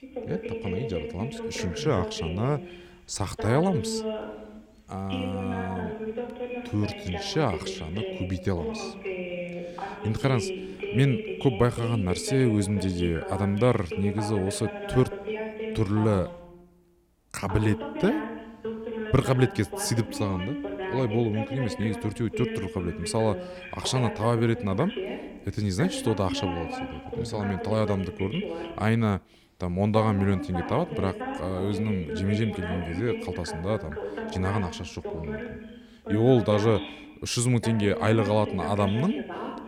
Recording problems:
voice in the background; loud; throughout; 7 dB below the speech

